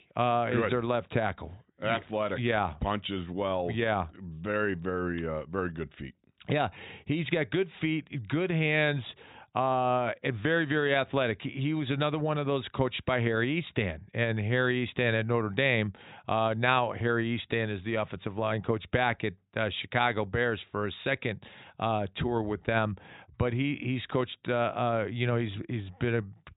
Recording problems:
high frequencies cut off; severe; nothing above 4 kHz

